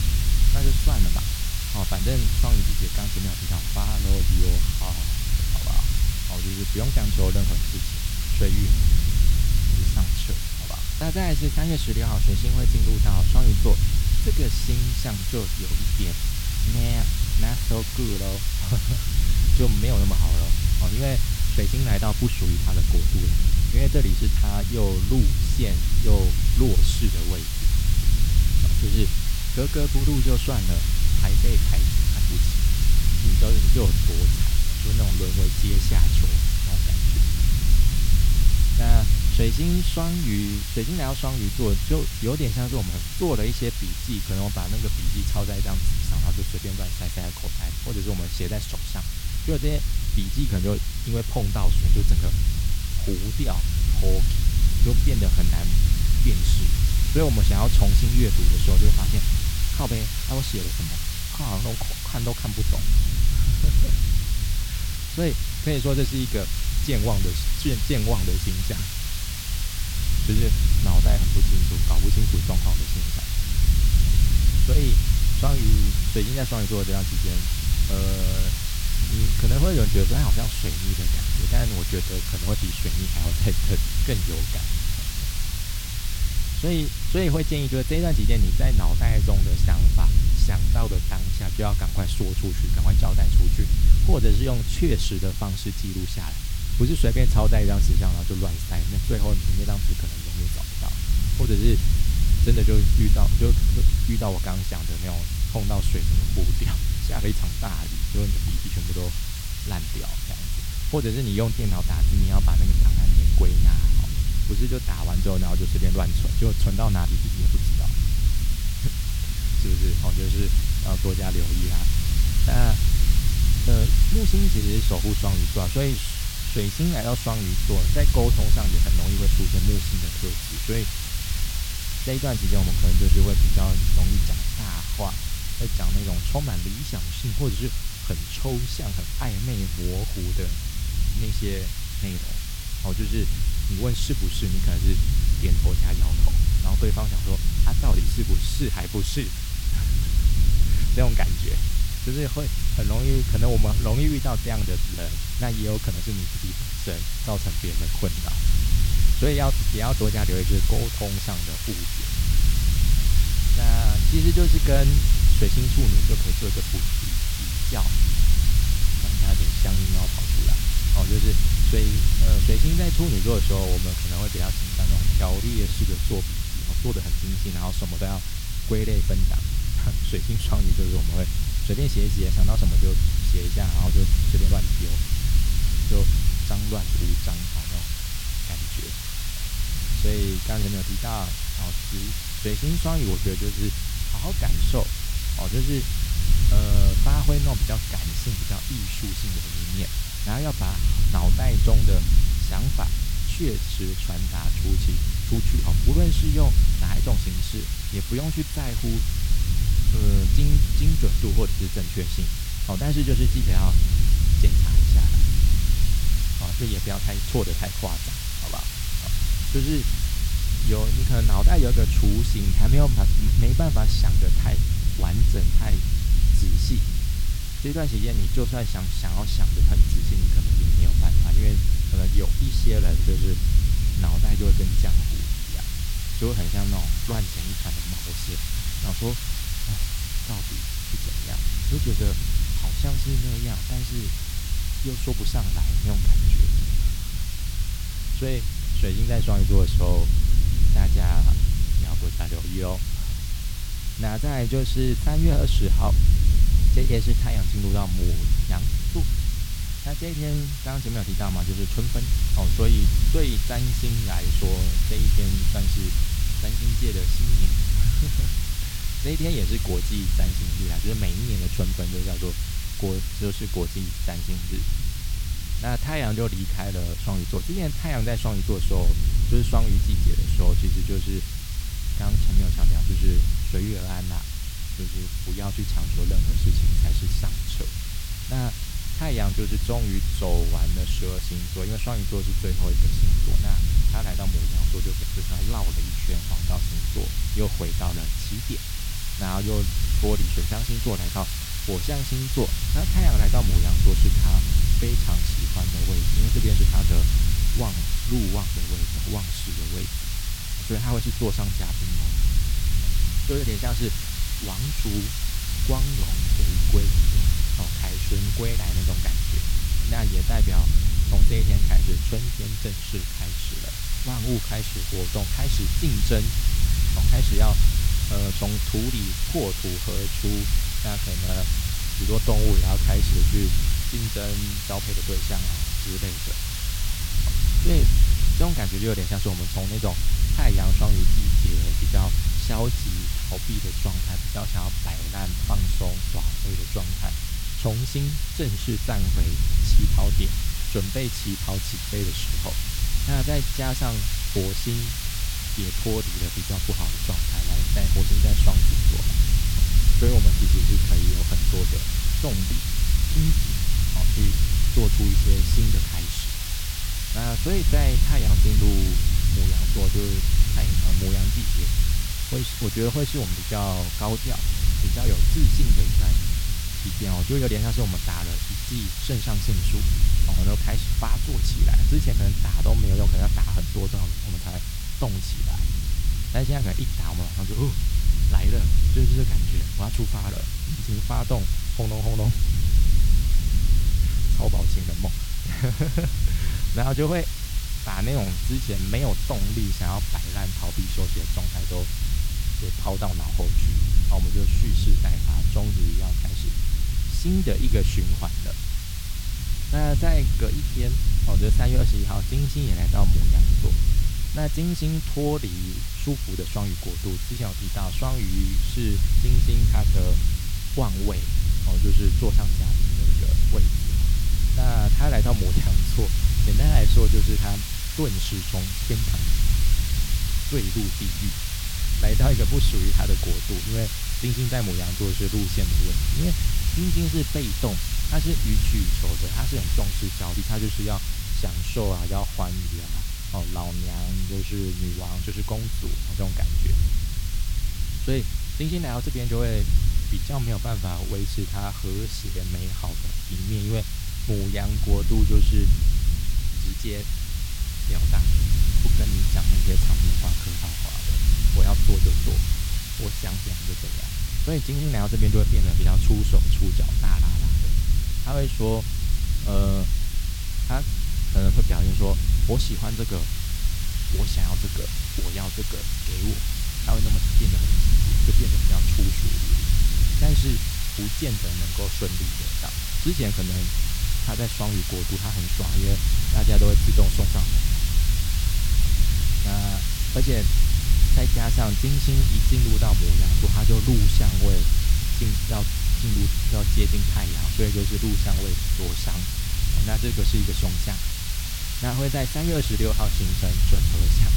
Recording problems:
wind noise on the microphone; heavy; 9 dB below the speech
hiss; loud; throughout; 3 dB below the speech

